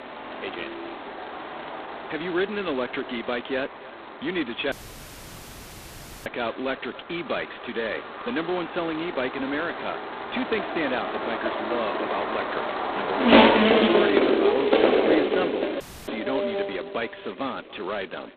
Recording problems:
phone-call audio; poor line; nothing above 4 kHz
echo of what is said; faint; throughout; 290 ms later, 20 dB below the speech
traffic noise; very loud; throughout; 6 dB above the speech
audio cutting out; at 4.5 s for 1.5 s and at 16 s

